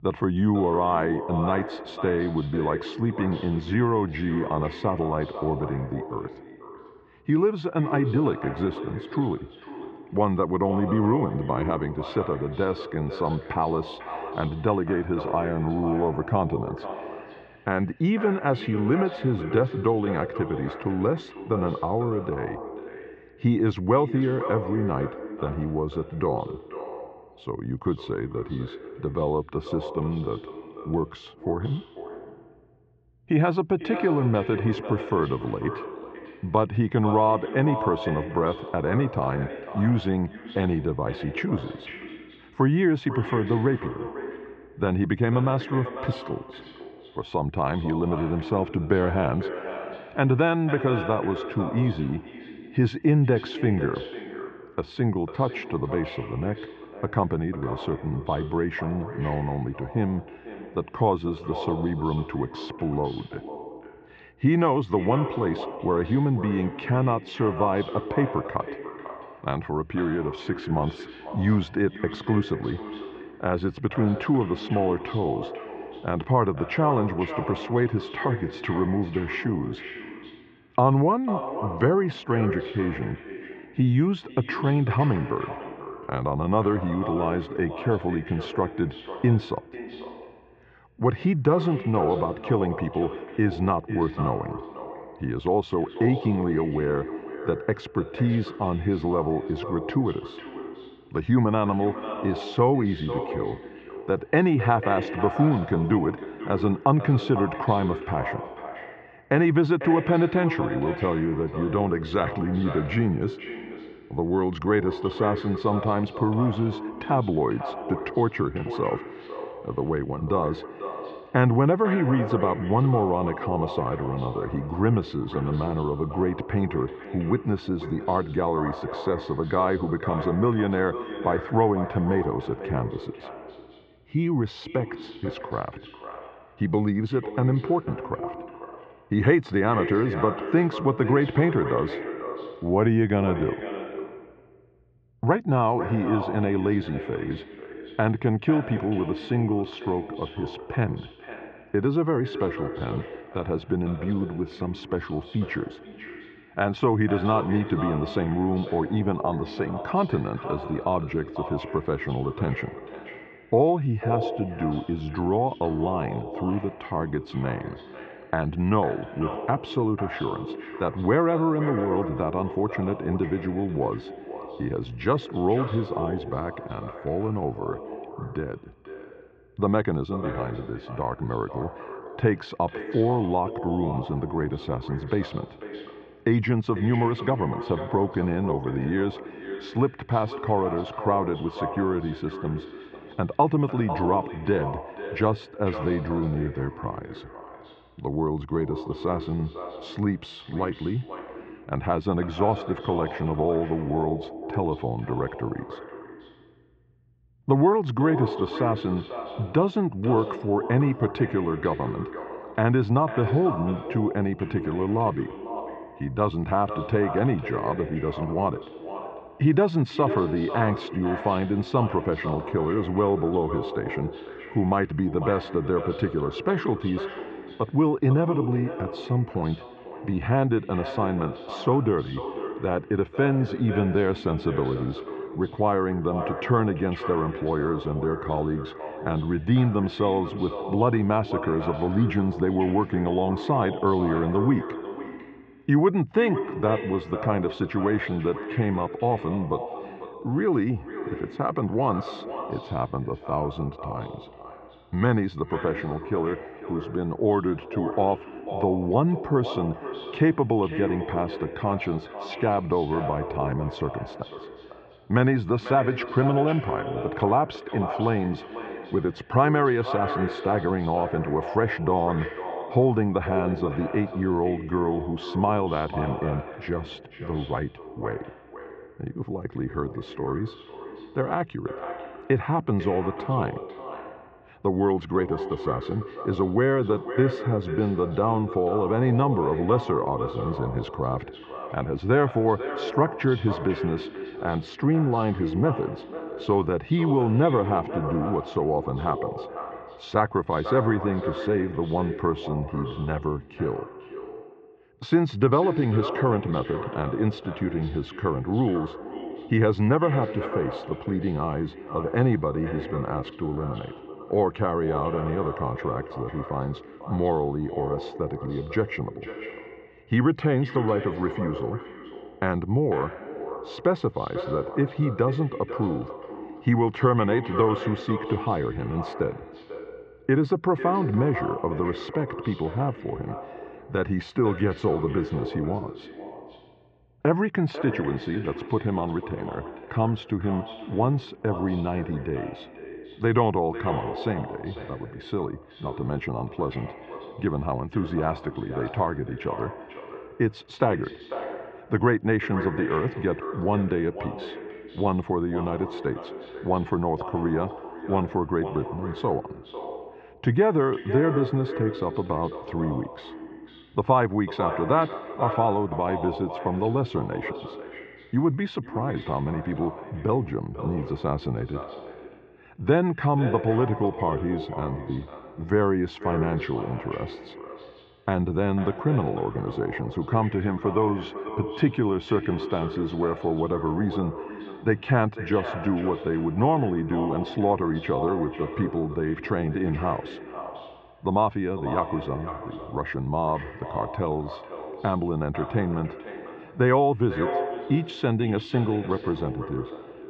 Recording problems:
echo of what is said; strong; throughout; 500 ms later, 10 dB below the speech
muffled; very; fading above 2.5 kHz

